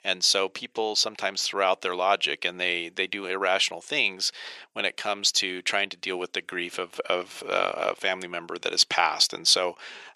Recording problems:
thin; very; fading below 500 Hz

